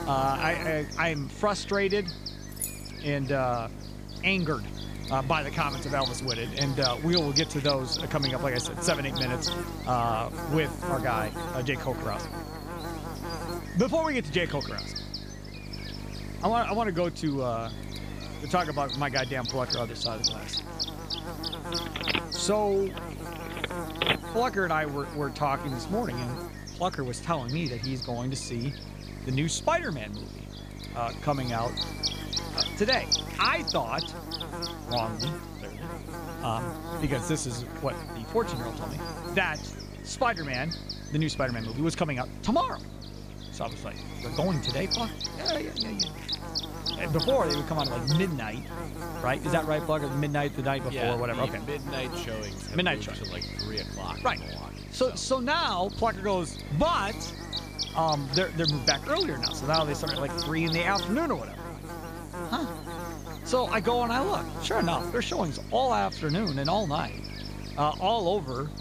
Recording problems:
electrical hum; loud; throughout; 50 Hz, 6 dB below the speech
background chatter; faint; throughout; 4 voices, 25 dB below the speech
jangling keys; noticeable; at 2.5 s; peak 5 dB below the speech
phone ringing; loud; from 22 to 24 s; peak 3 dB above the speech

